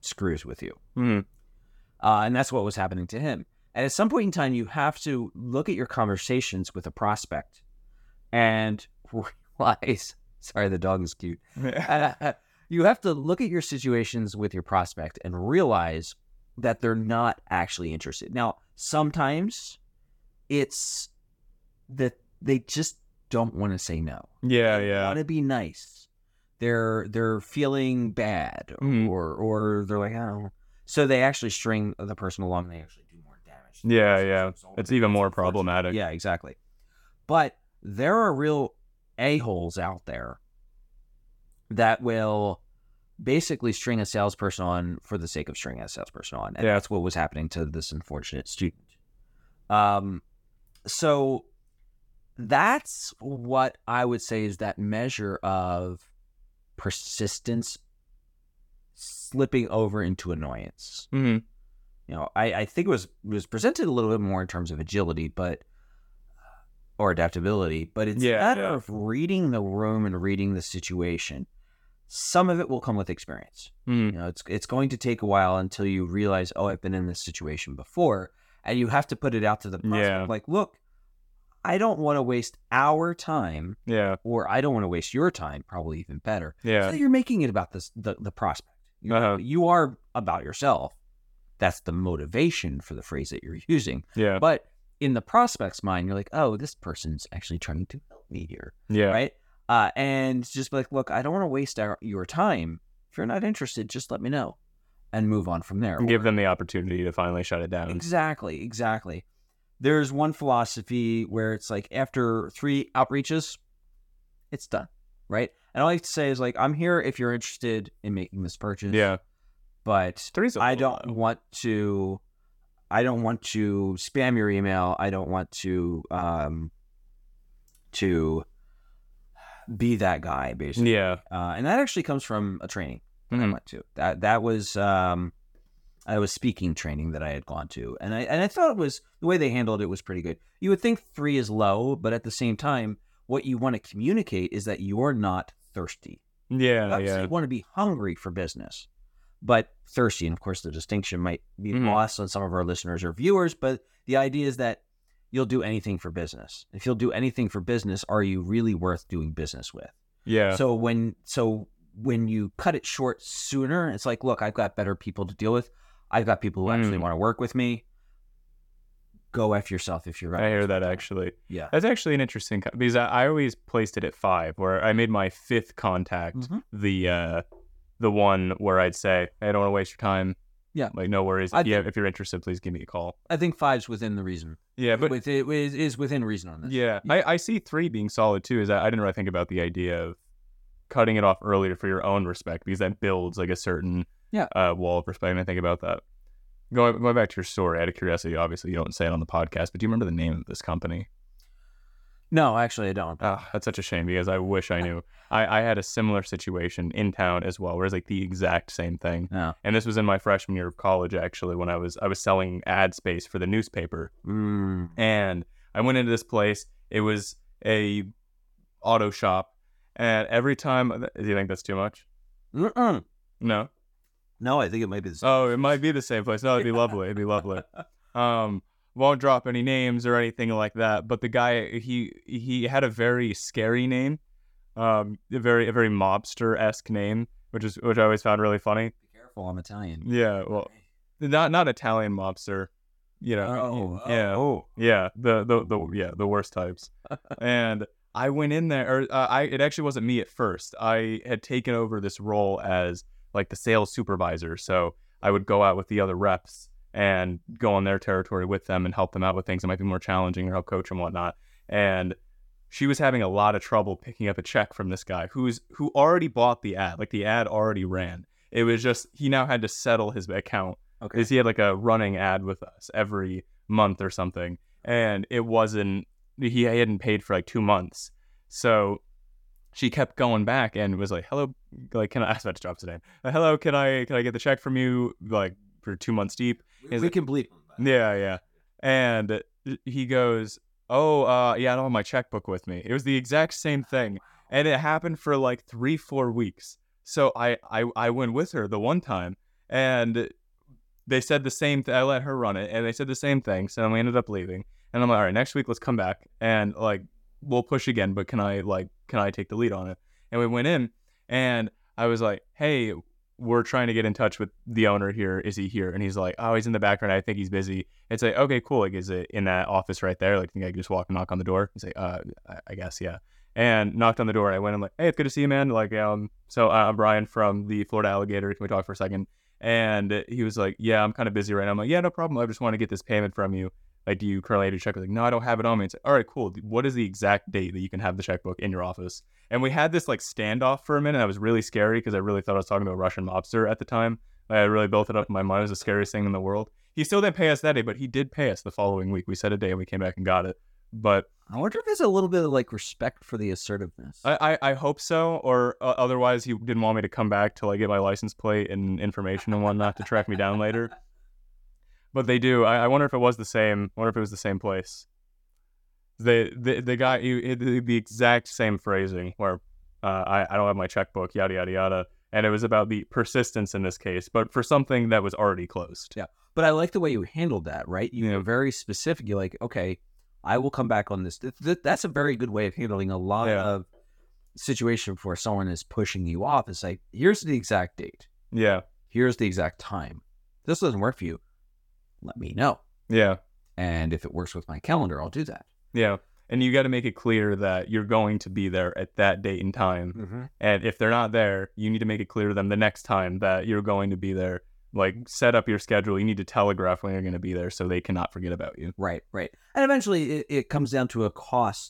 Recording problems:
none

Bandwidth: 17 kHz